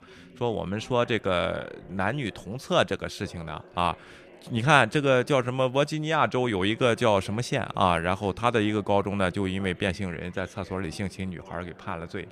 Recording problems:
background chatter; faint; throughout; 3 voices, 25 dB below the speech

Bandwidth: 14.5 kHz